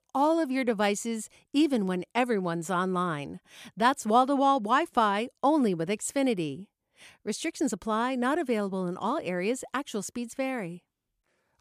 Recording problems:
none

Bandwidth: 14.5 kHz